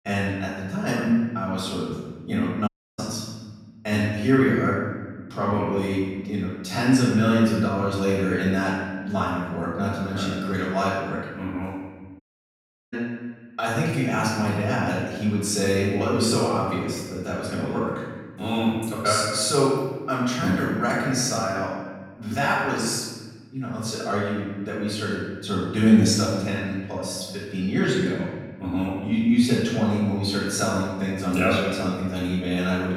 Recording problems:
off-mic speech; far
room echo; noticeable; dies away in 1.3 s
audio cutting out; at 2.5 s and at 12 s for 0.5 s

